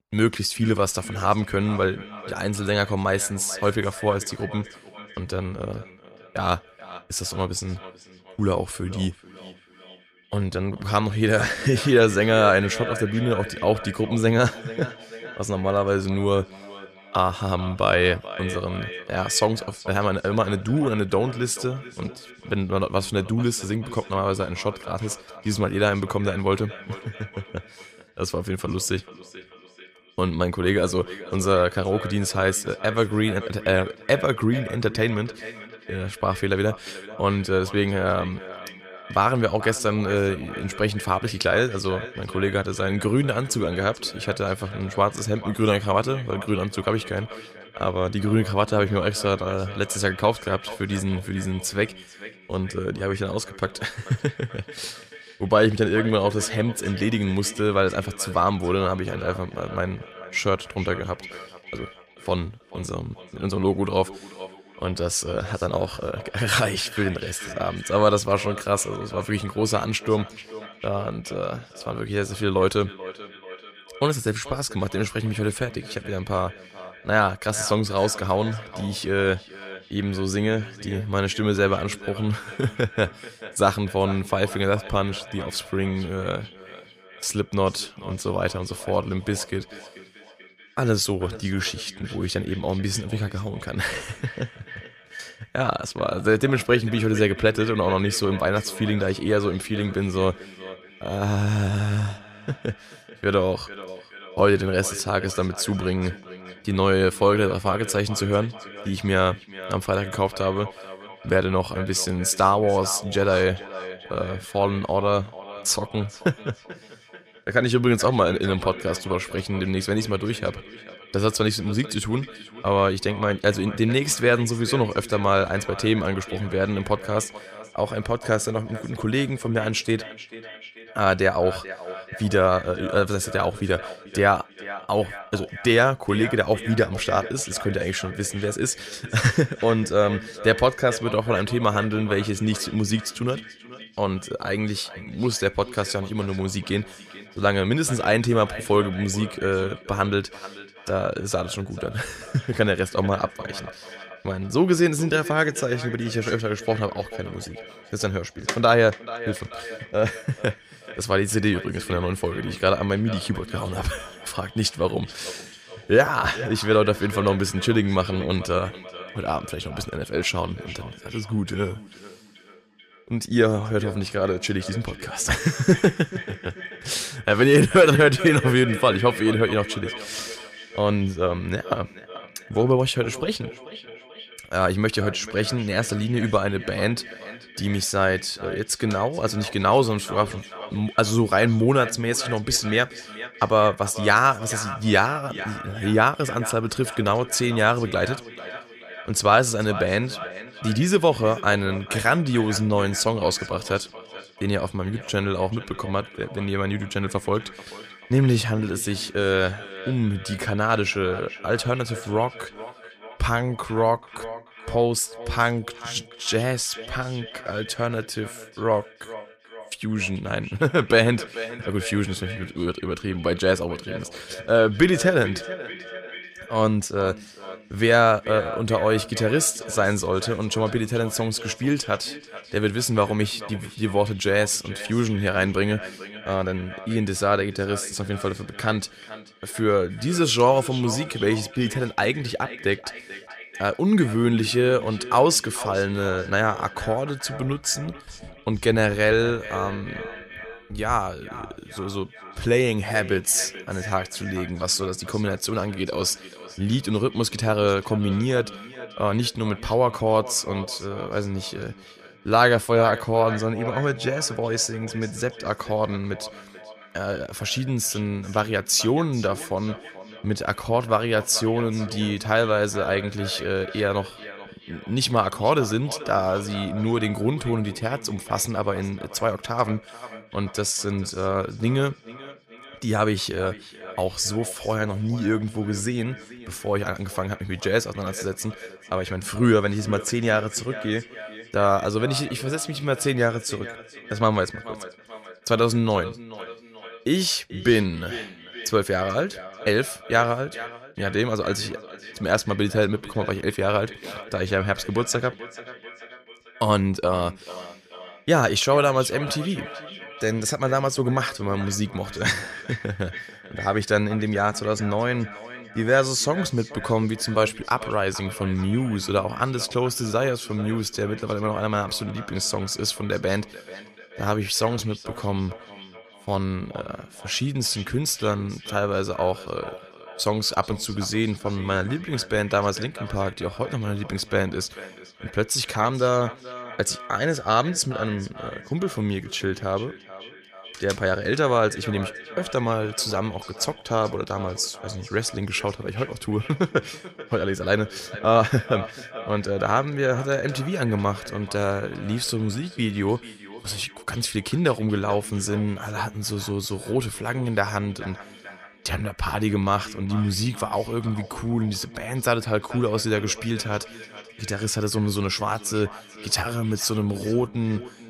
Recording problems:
echo of what is said; noticeable; throughout; 440 ms later, 15 dB below the speech

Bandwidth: 15 kHz